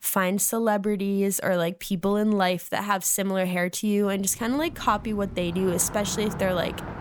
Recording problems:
traffic noise; noticeable; from 4.5 s on; 10 dB below the speech

